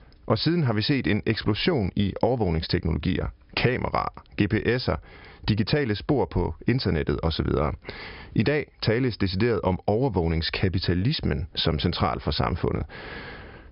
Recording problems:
high frequencies cut off; noticeable; nothing above 5 kHz
squashed, flat; somewhat

